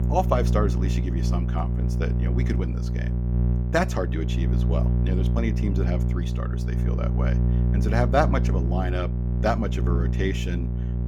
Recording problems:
electrical hum; loud; throughout; 60 Hz, 7 dB below the speech

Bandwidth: 17.5 kHz